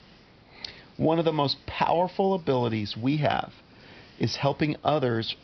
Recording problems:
high frequencies cut off; noticeable; nothing above 5.5 kHz
hiss; faint; throughout; 25 dB below the speech

